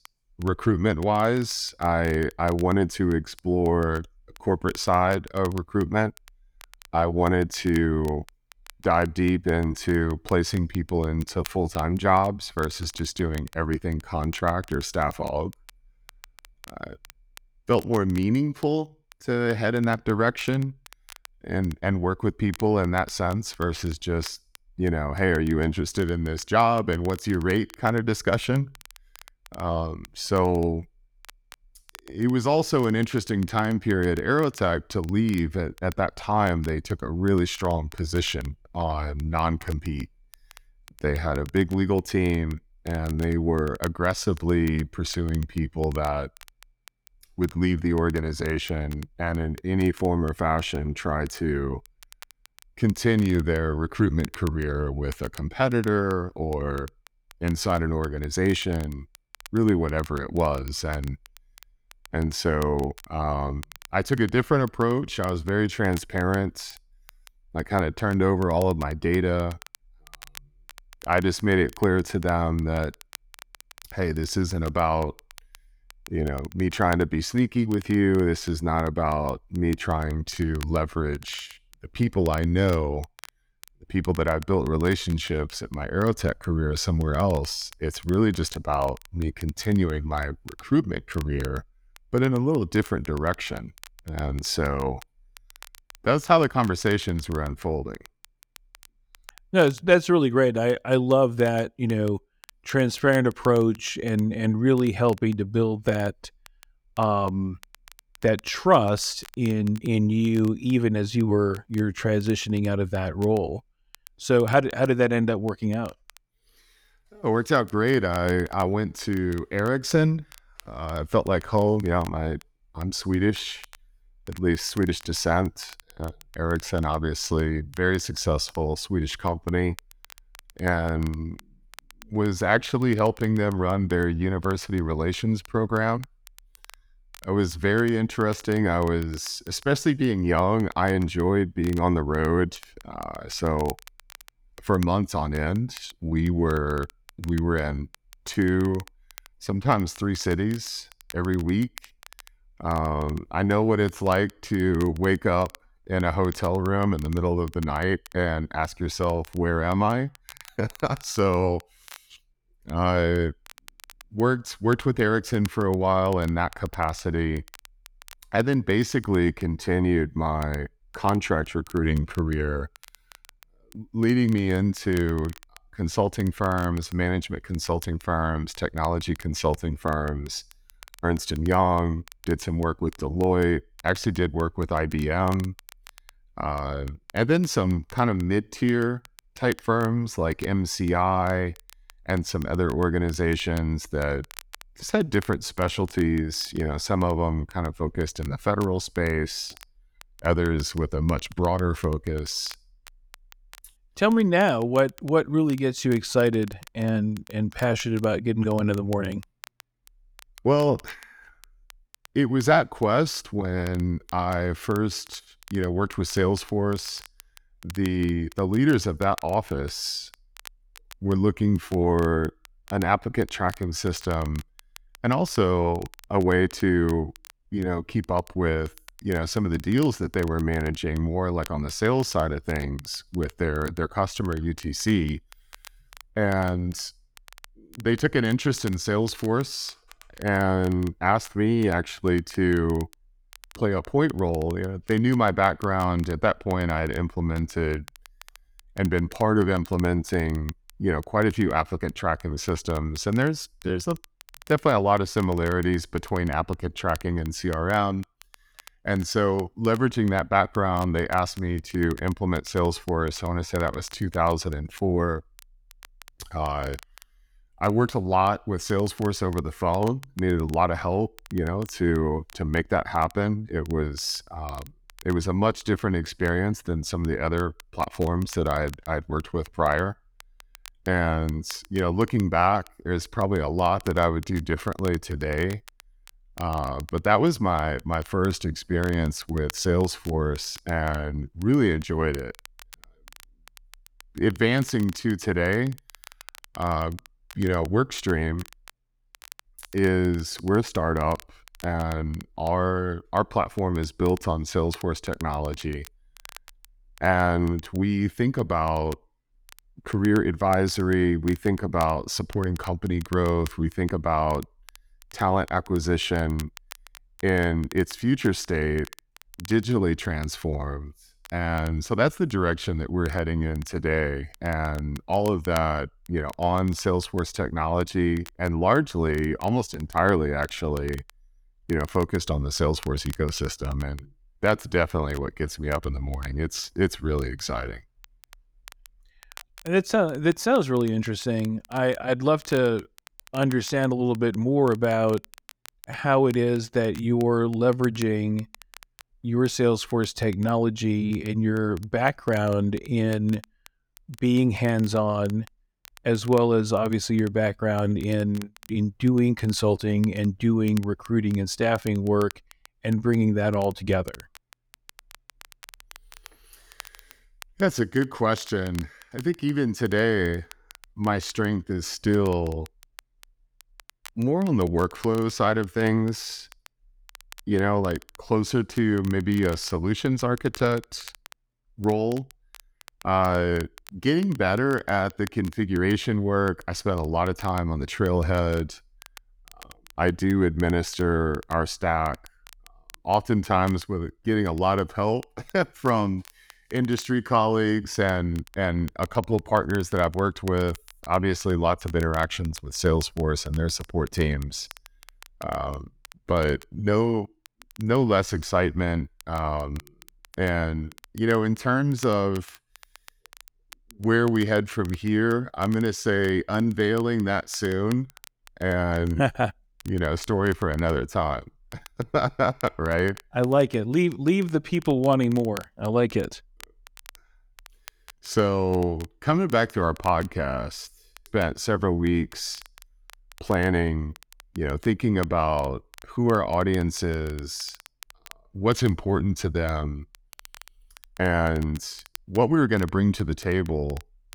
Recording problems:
crackle, like an old record; faint; 25 dB below the speech

